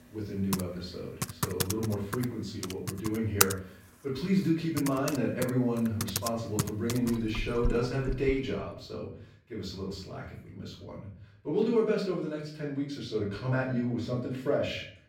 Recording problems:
off-mic speech; far
room echo; noticeable; dies away in 0.5 s
household noises; loud; until 8.5 s; 3 dB below the speech

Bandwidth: 16 kHz